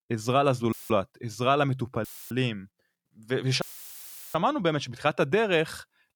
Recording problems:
audio cutting out; filled with static; at 0.5 s, at 2 s and at 3.5 s for 0.5 s

